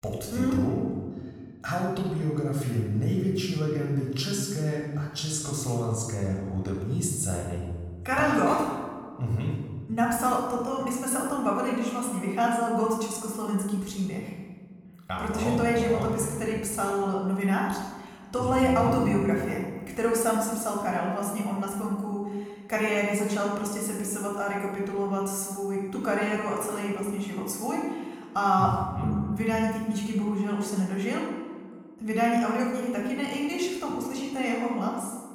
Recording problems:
room echo; noticeable; dies away in 1.2 s
off-mic speech; somewhat distant

